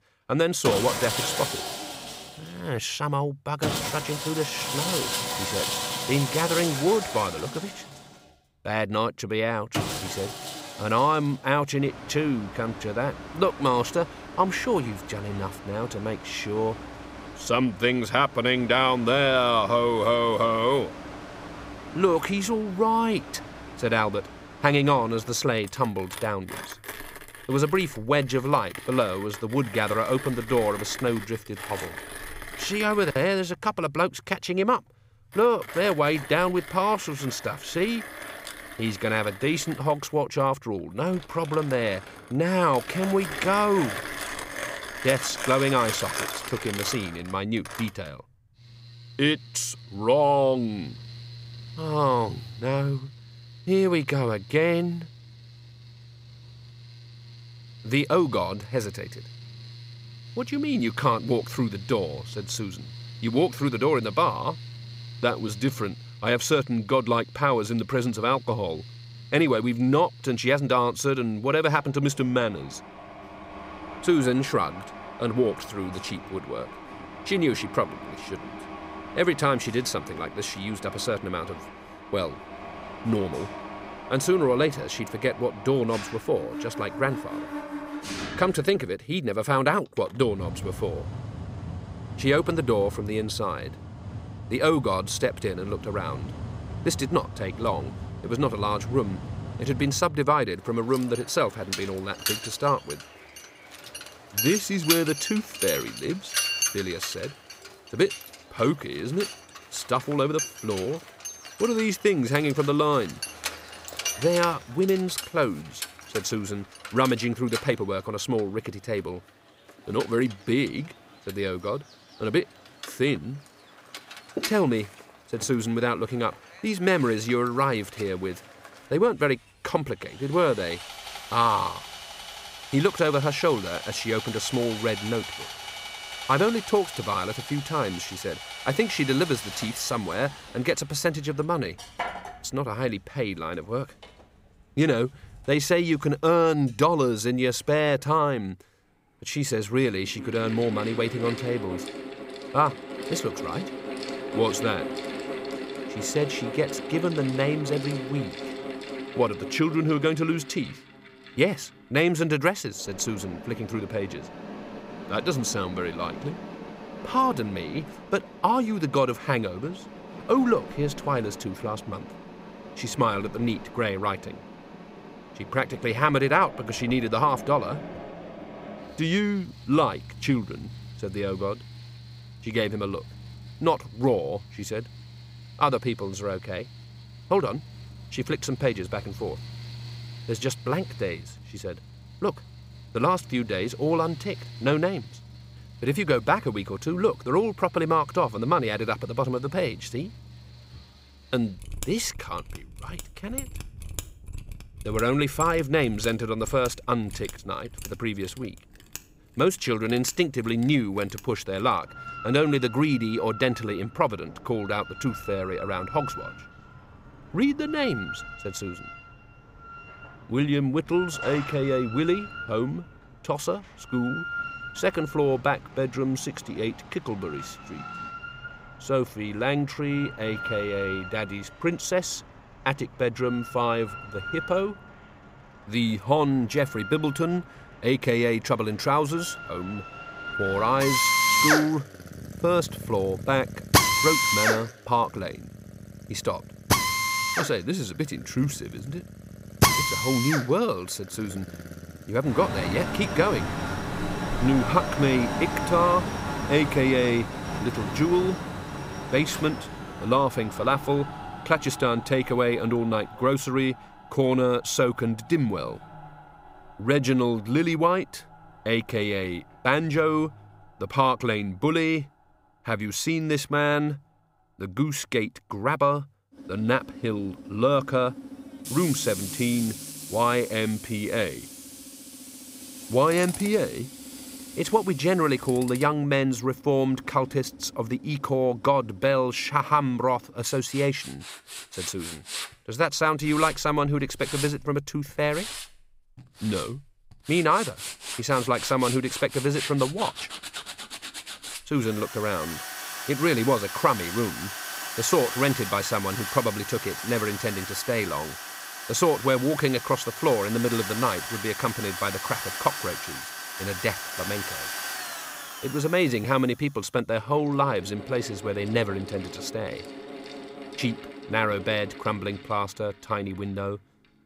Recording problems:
machinery noise; loud; throughout; 8 dB below the speech

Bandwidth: 15.5 kHz